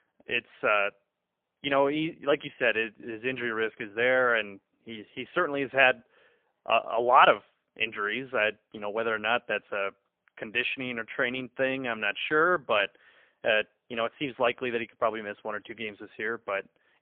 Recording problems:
phone-call audio; poor line; nothing above 3 kHz

